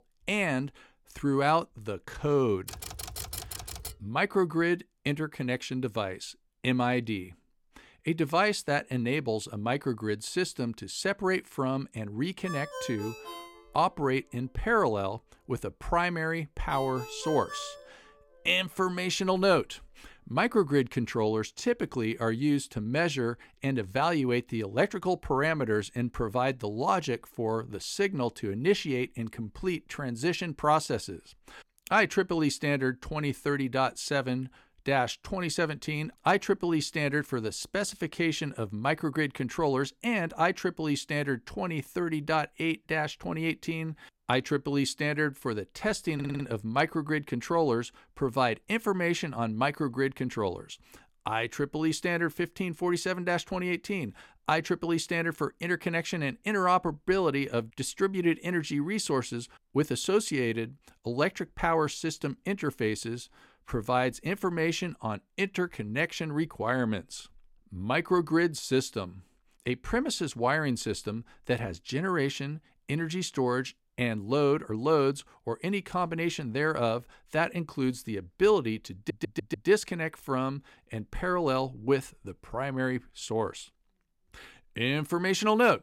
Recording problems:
keyboard typing; noticeable; from 2.5 to 4 s; peak 7 dB below the speech
phone ringing; noticeable; from 12 to 18 s; peak 9 dB below the speech
audio stuttering; at 46 s and at 1:19

